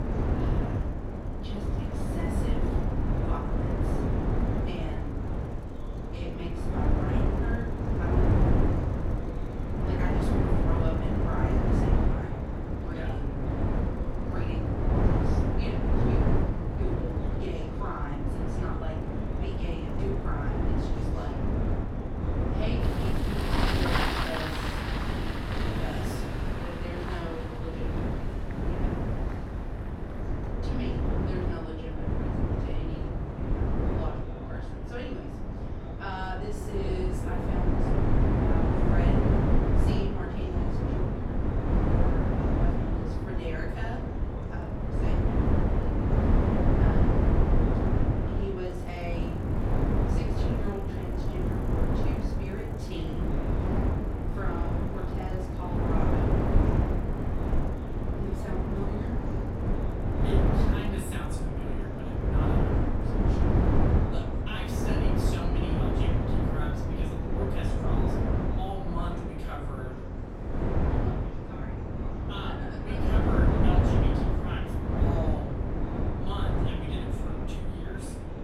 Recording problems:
off-mic speech; far
room echo; noticeable; dies away in 0.5 s
wind noise on the microphone; heavy; 5 dB above the speech
traffic noise; loud; throughout; 1 dB below the speech
chatter from many people; noticeable; throughout; 10 dB below the speech
train or aircraft noise; faint; throughout; 25 dB below the speech

